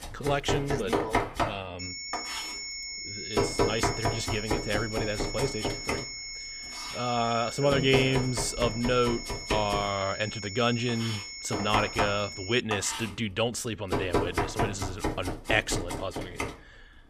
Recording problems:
high-pitched whine; loud; from 2 to 13 s; 5.5 kHz, 7 dB below the speech
household noises; loud; throughout; 3 dB below the speech

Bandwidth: 14.5 kHz